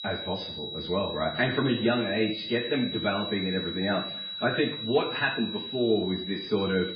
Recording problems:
garbled, watery; badly; nothing above 5 kHz
room echo; slight; dies away in 0.6 s
off-mic speech; somewhat distant
high-pitched whine; loud; throughout; 4 kHz, 6 dB below the speech

